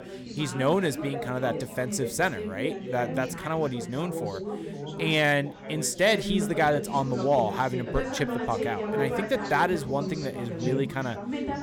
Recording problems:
background chatter; loud; throughout; 4 voices, 6 dB below the speech

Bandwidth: 17.5 kHz